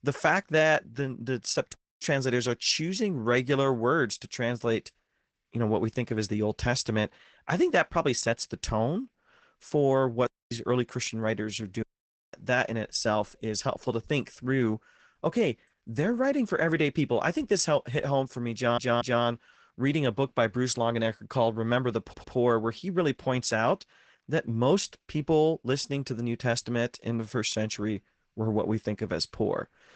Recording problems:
garbled, watery; badly; nothing above 8 kHz
audio cutting out; at 1.5 s, at 10 s and at 12 s for 0.5 s
audio stuttering; at 19 s and at 22 s

